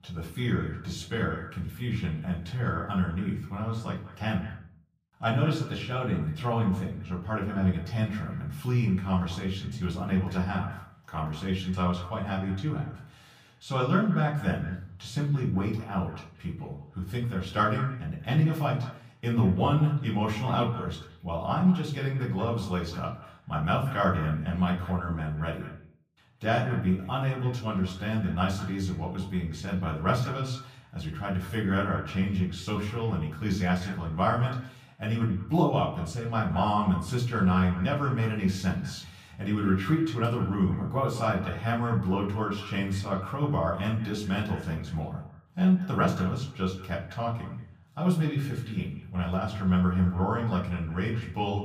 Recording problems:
off-mic speech; far
echo of what is said; faint; throughout; 180 ms later, 20 dB below the speech
room echo; slight; dies away in 0.4 s

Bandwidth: 15 kHz